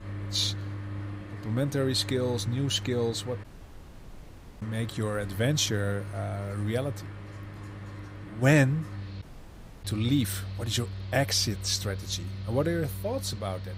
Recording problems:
machinery noise; loud; throughout; 10 dB below the speech
audio cutting out; at 3.5 s for 1 s and at 9 s for 0.5 s

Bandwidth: 15.5 kHz